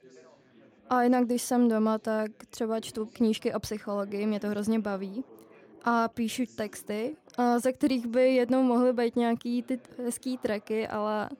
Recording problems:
background chatter; faint; throughout; 3 voices, 25 dB below the speech

